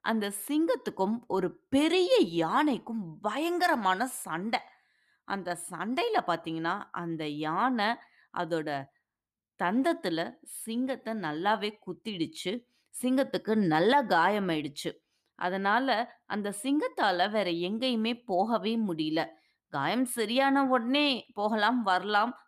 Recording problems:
none

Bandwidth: 14.5 kHz